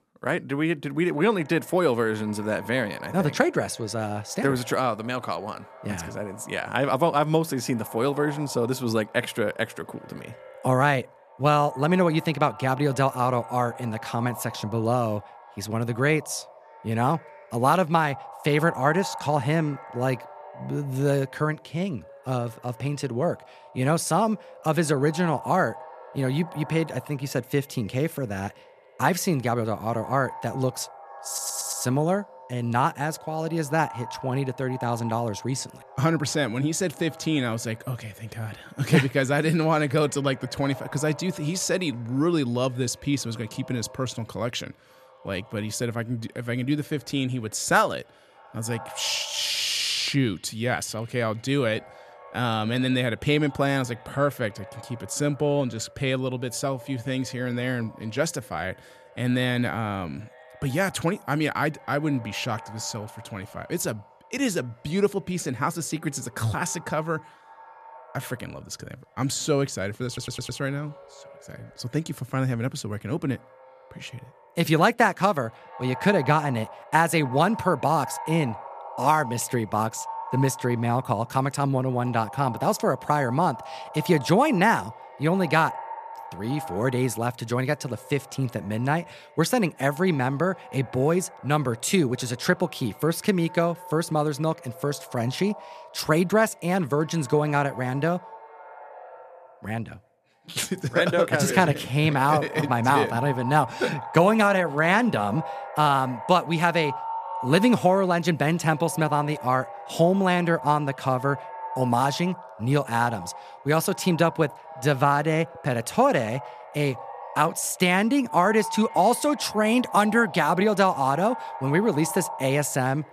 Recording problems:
echo of what is said; noticeable; throughout; 280 ms later, 15 dB below the speech
audio stuttering; at 31 s and at 1:10

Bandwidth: 14.5 kHz